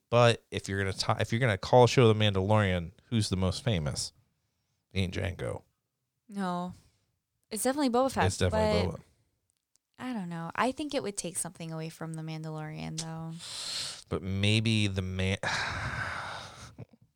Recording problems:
none

